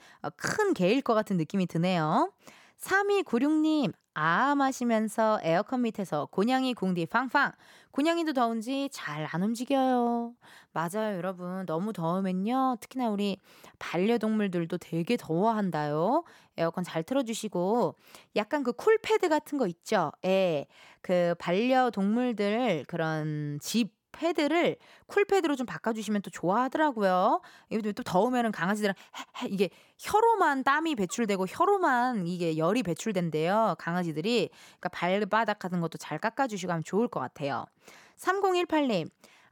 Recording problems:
none

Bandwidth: 18 kHz